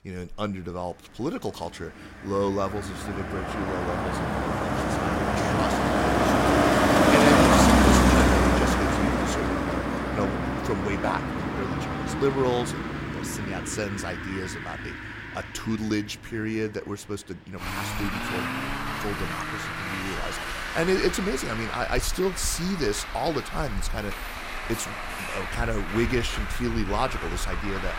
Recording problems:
traffic noise; very loud; throughout; 5 dB above the speech

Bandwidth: 16 kHz